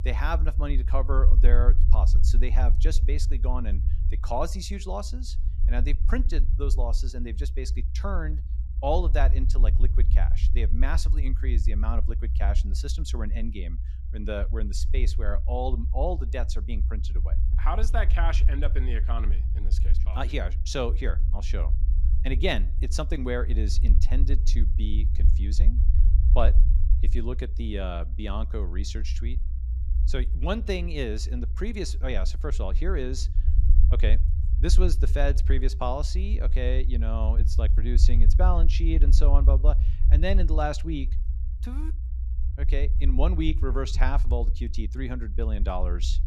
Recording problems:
low rumble; noticeable; throughout; 15 dB below the speech

